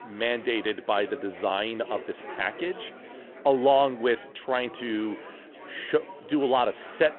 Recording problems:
phone-call audio; nothing above 3.5 kHz
chatter from many people; noticeable; throughout; 15 dB below the speech

